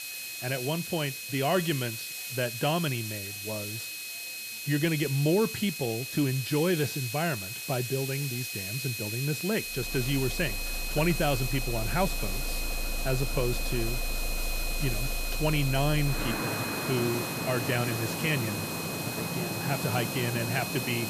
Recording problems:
high-pitched whine; loud; throughout; 2.5 kHz, 7 dB below the speech
traffic noise; loud; from 10 s on; 6 dB below the speech
hiss; loud; throughout; 6 dB below the speech
murmuring crowd; faint; throughout; 30 dB below the speech

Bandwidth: 14.5 kHz